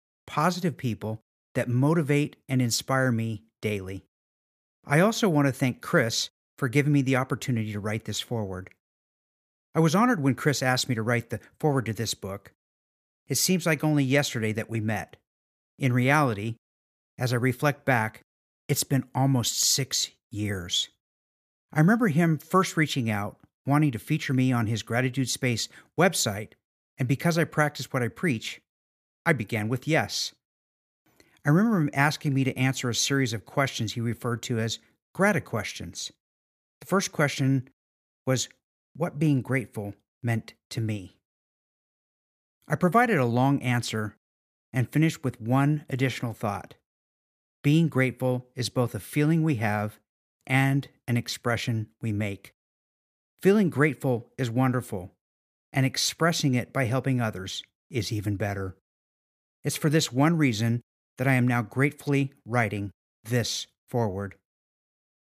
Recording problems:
none

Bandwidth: 14.5 kHz